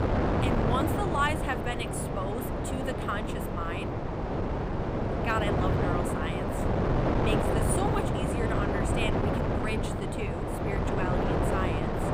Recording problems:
wind noise on the microphone; heavy; 2 dB above the speech

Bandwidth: 15.5 kHz